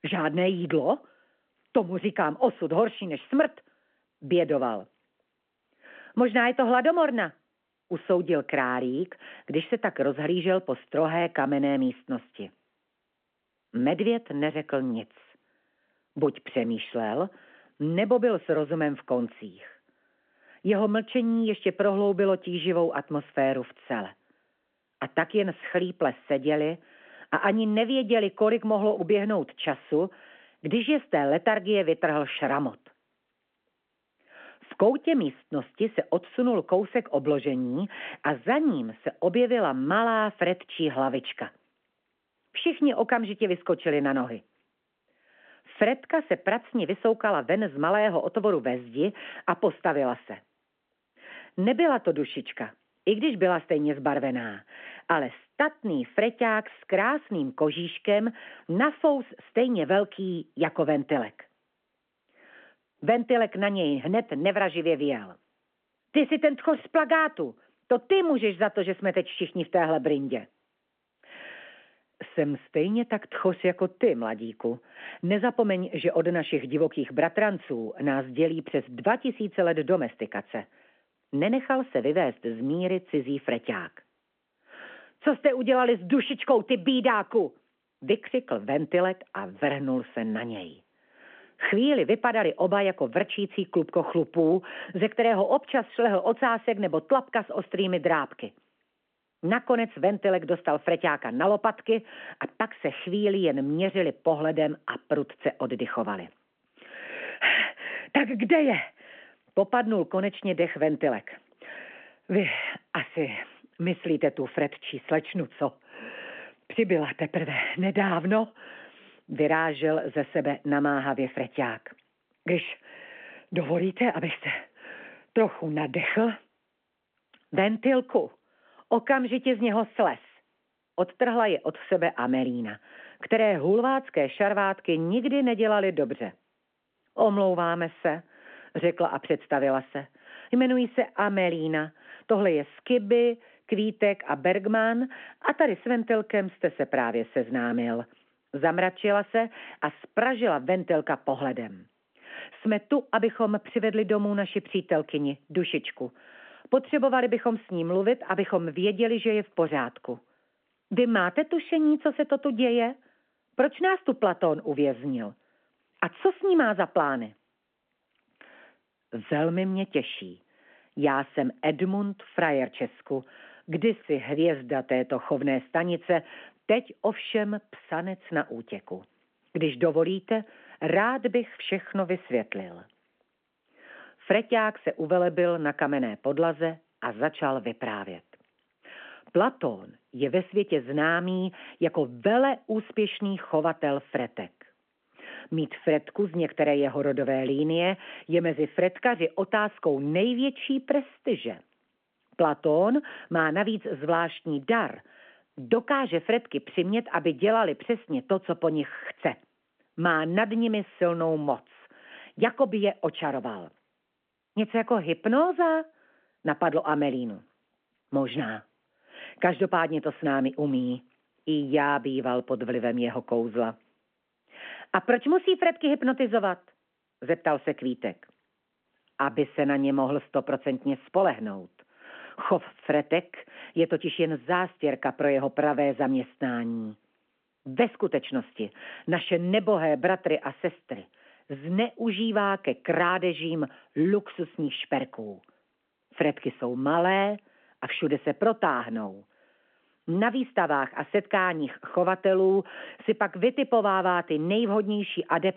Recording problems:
phone-call audio

